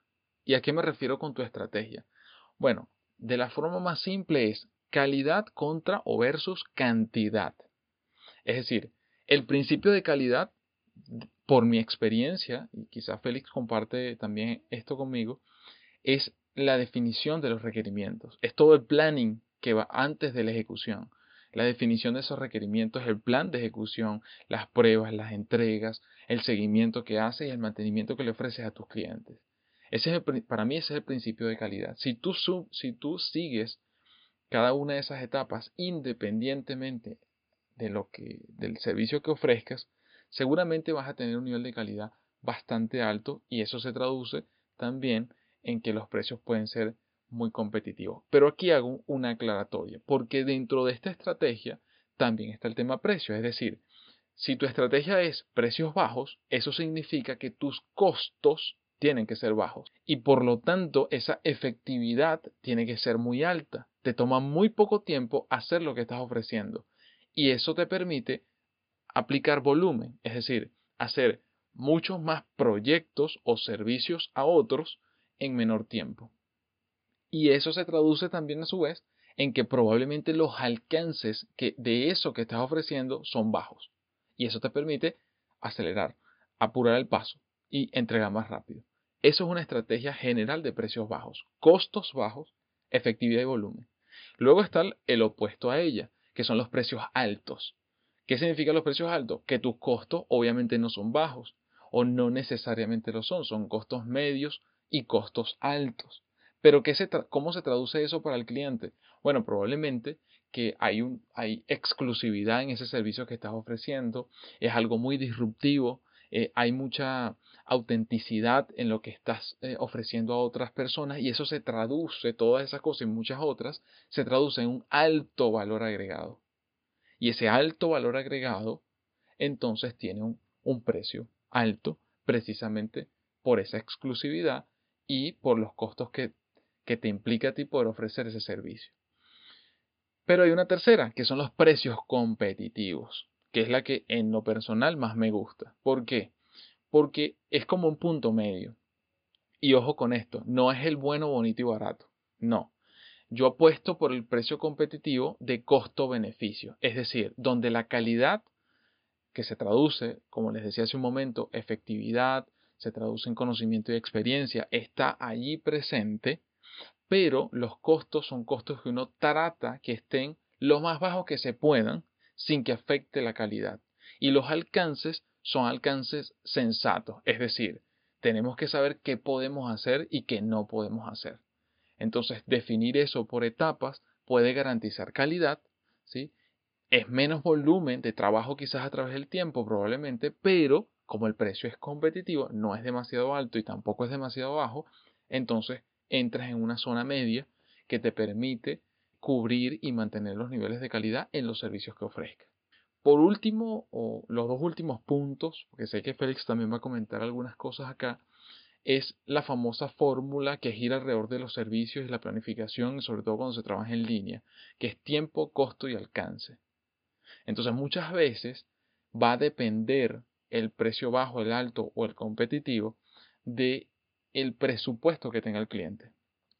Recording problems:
high frequencies cut off; severe; nothing above 5 kHz

